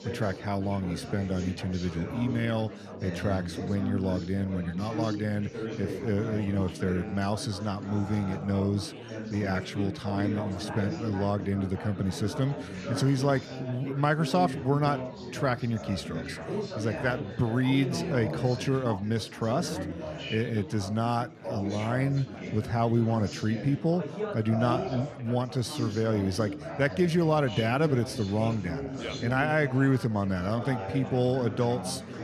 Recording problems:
chatter from many people; loud; throughout; 8 dB below the speech

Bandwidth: 14.5 kHz